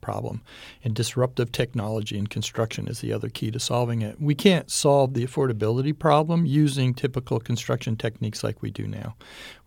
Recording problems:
none

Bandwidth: 18 kHz